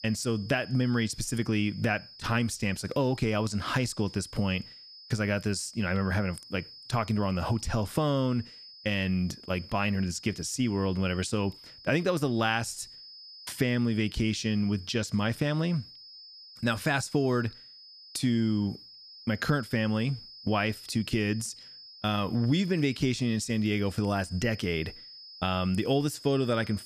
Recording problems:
high-pitched whine; noticeable; throughout; 5 kHz, 15 dB below the speech

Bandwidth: 14.5 kHz